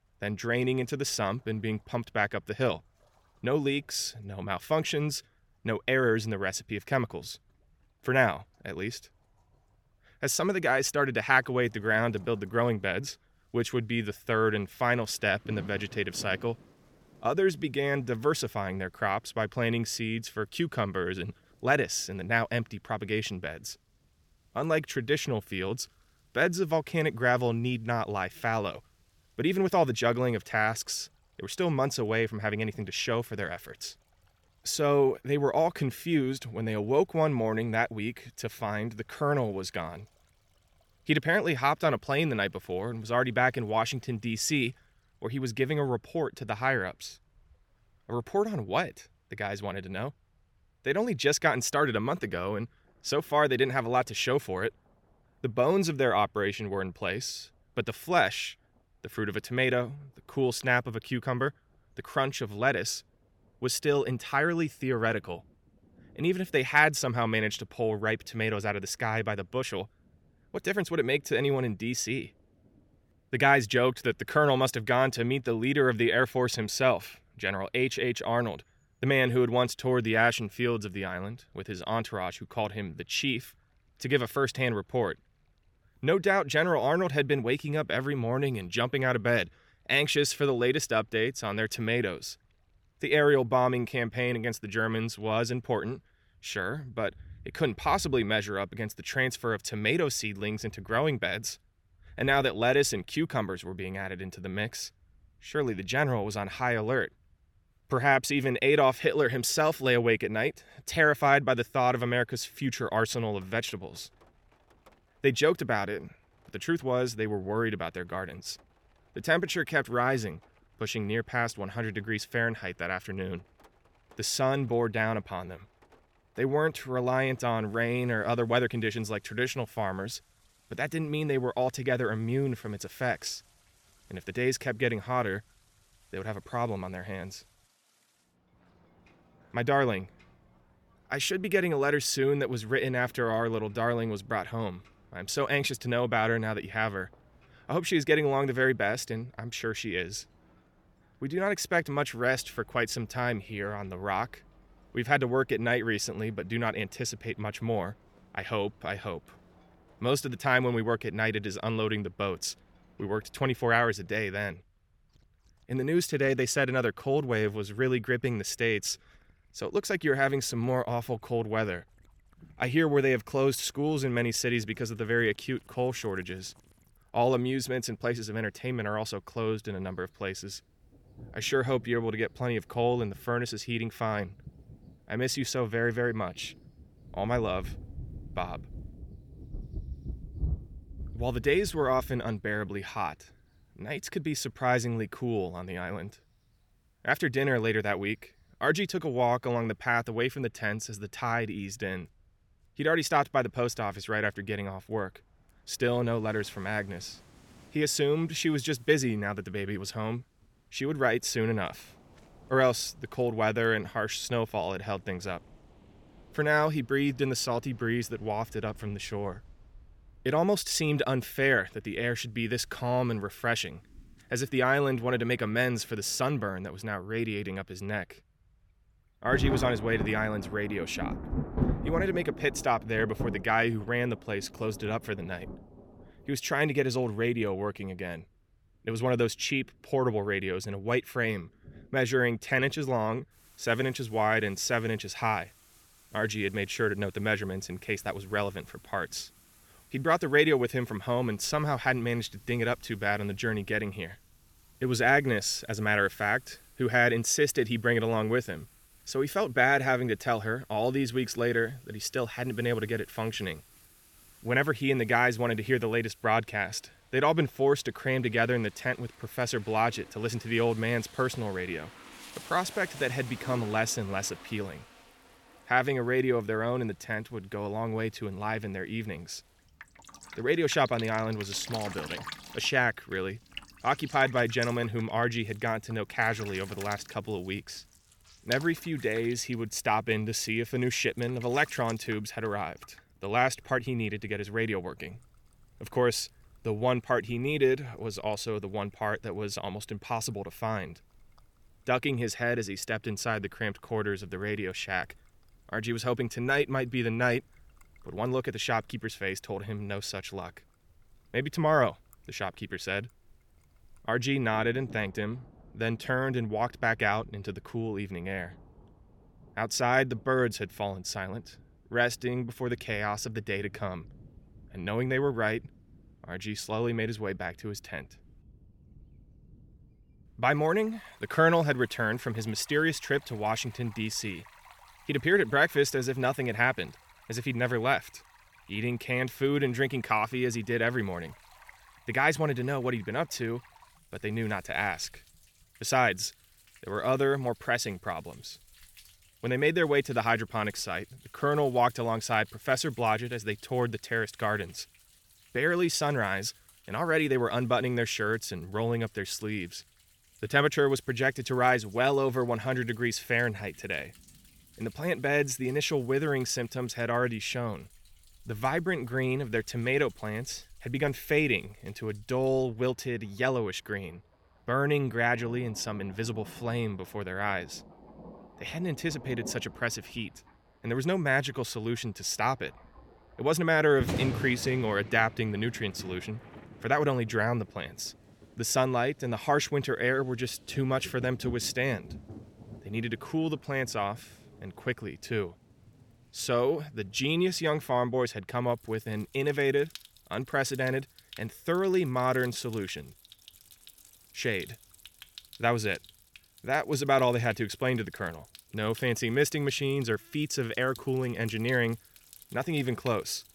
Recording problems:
rain or running water; noticeable; throughout; 20 dB below the speech

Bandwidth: 18 kHz